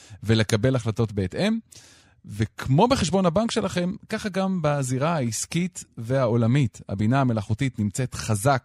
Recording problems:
none

